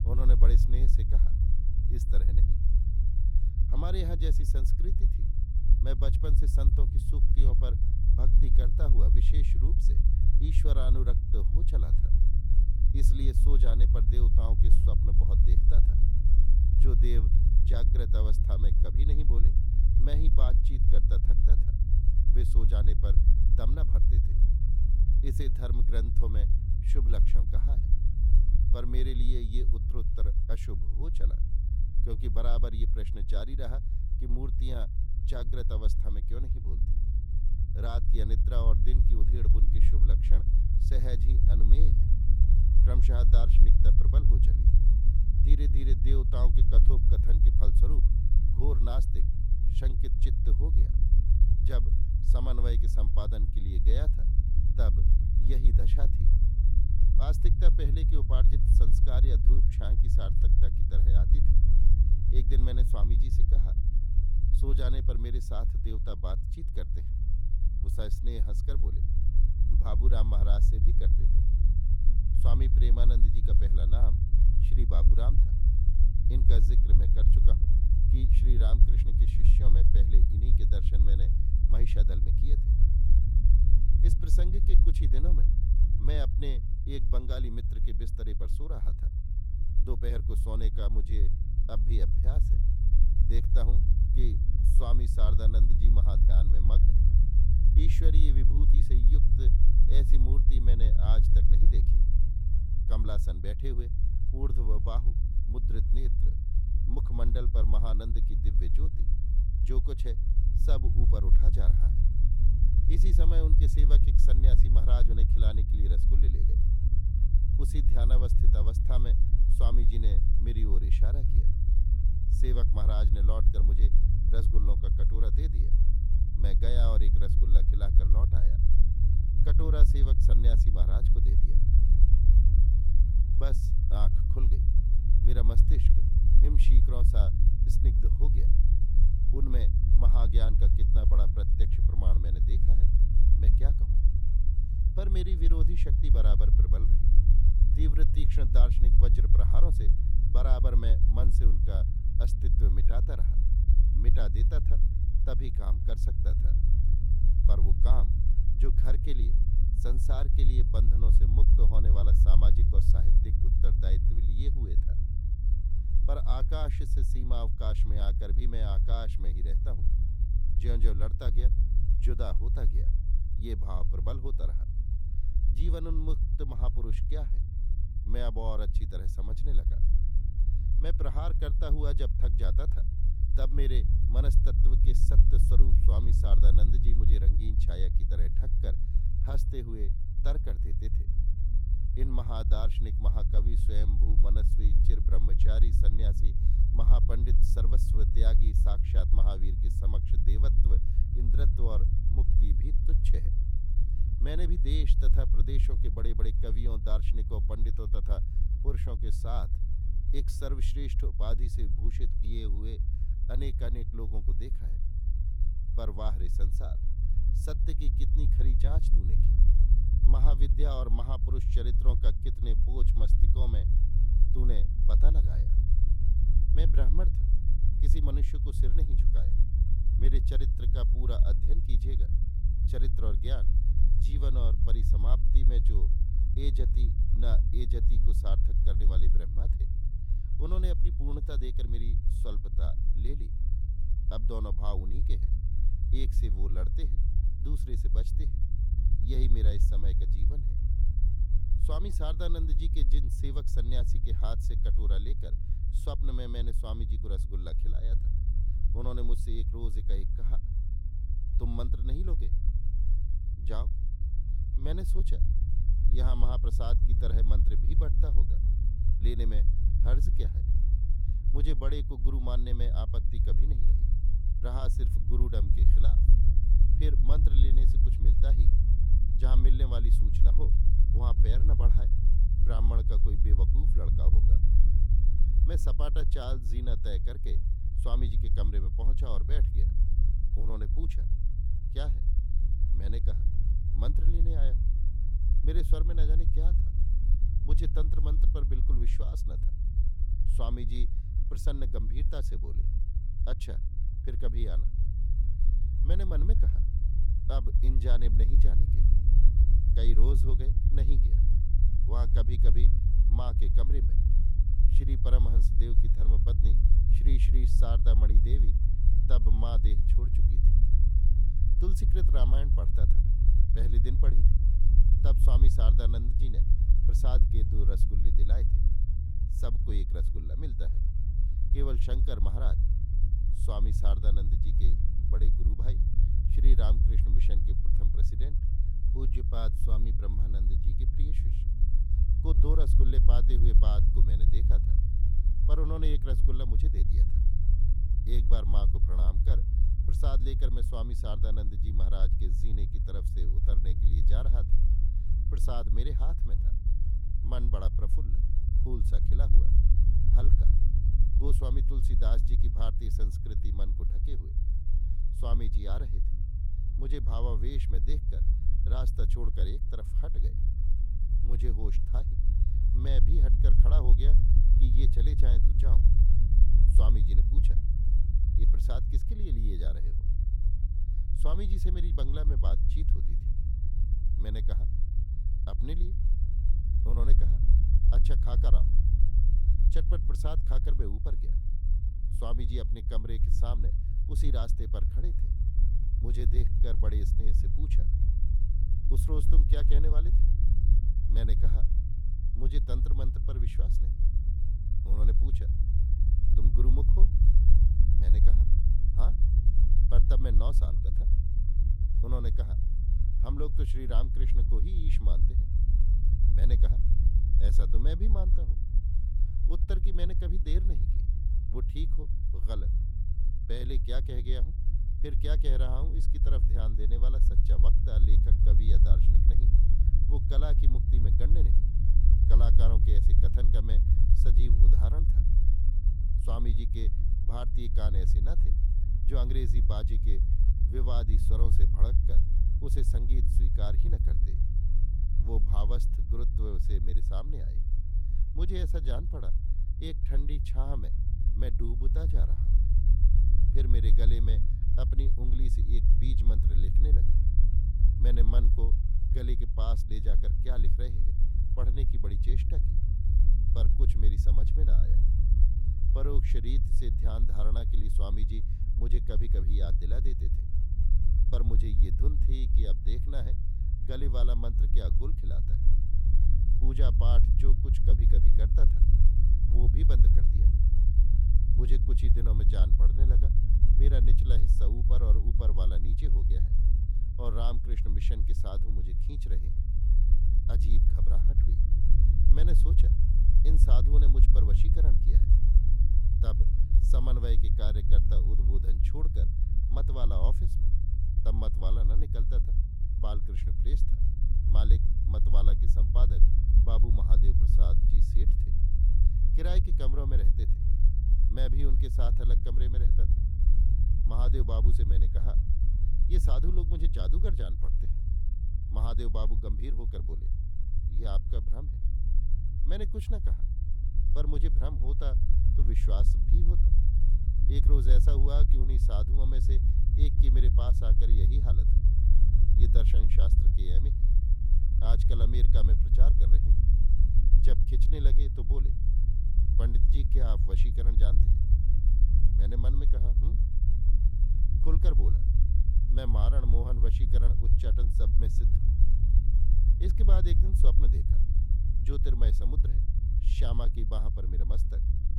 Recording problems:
low rumble; loud; throughout; 3 dB below the speech

